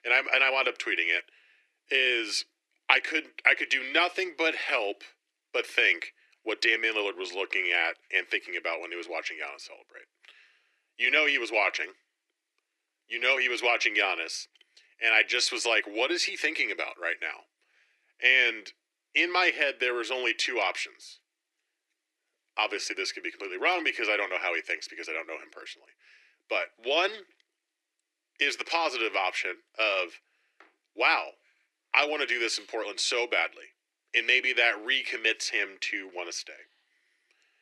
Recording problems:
thin; very; fading below 350 Hz

